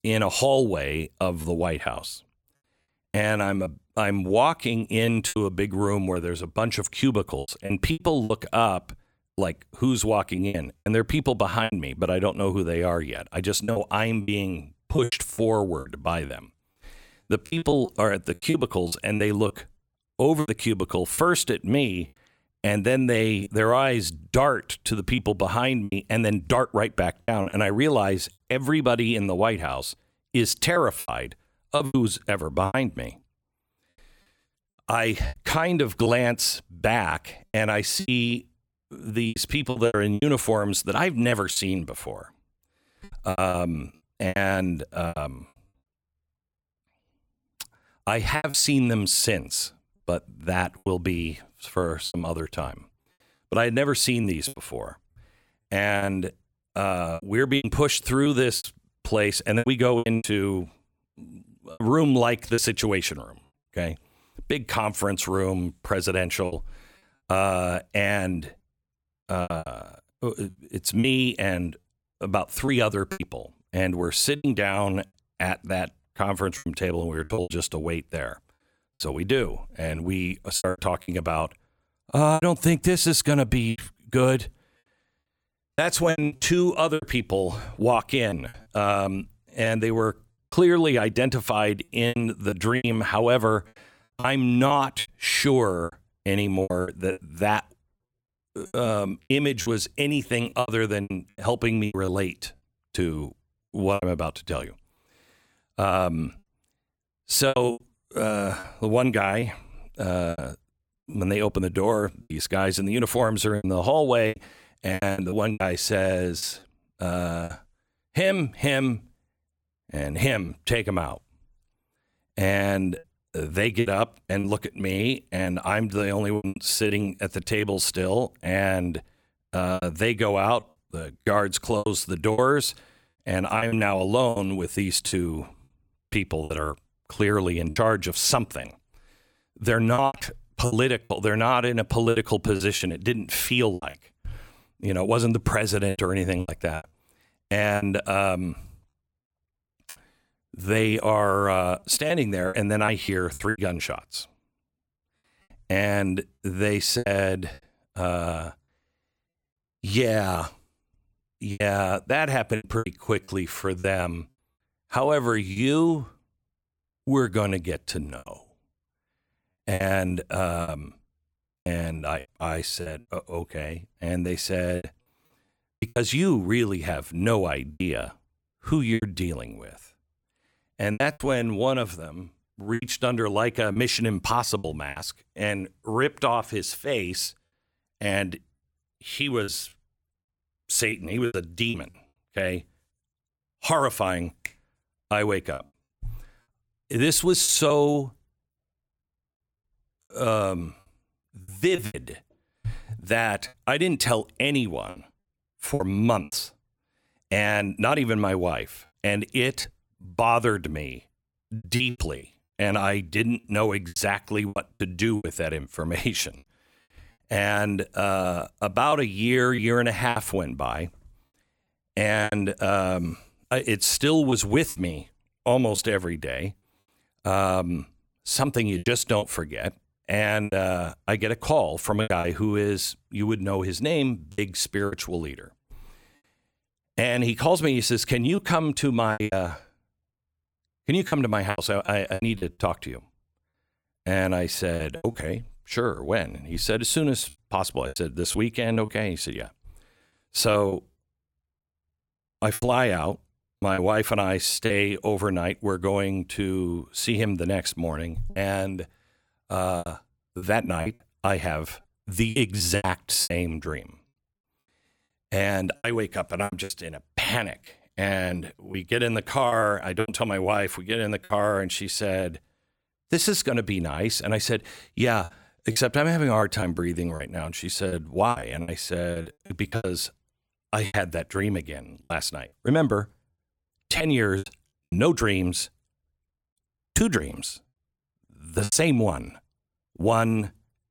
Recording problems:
choppy; very; 8% of the speech affected

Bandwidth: 17.5 kHz